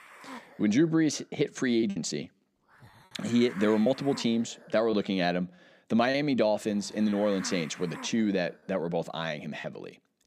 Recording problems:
hiss; noticeable; throughout; 20 dB below the speech
choppy; occasionally; from 2 to 6 s; 4% of the speech affected

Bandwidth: 14.5 kHz